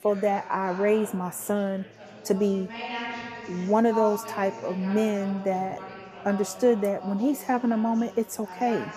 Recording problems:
background chatter; noticeable; throughout; 4 voices, 10 dB below the speech

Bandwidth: 14.5 kHz